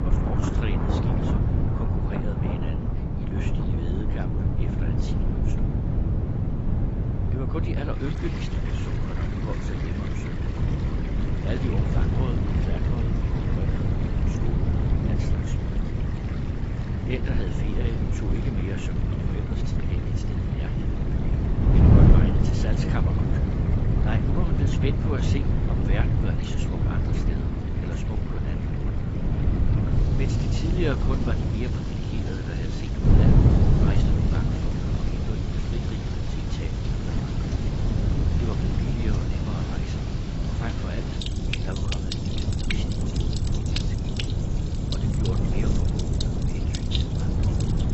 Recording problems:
garbled, watery; badly; nothing above 7.5 kHz
wind noise on the microphone; heavy; 4 dB above the speech
rain or running water; loud; throughout; 4 dB below the speech

